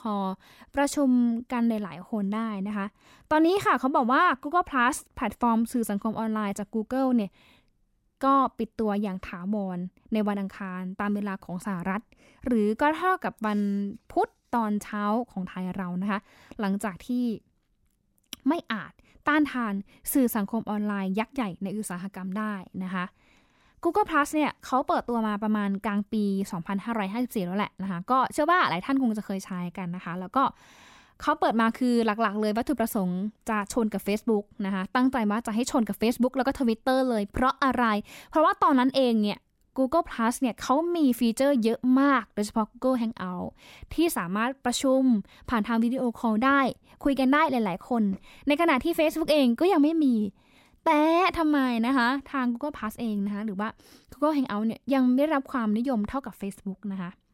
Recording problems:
none

